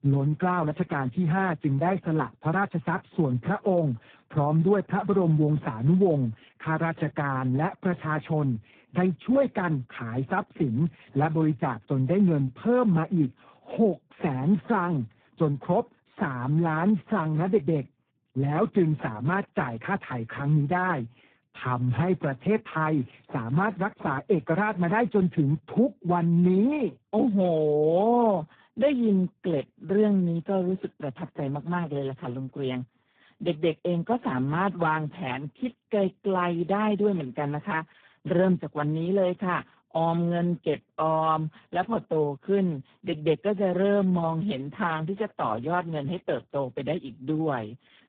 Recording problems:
garbled, watery; badly; nothing above 3.5 kHz
high frequencies cut off; slight

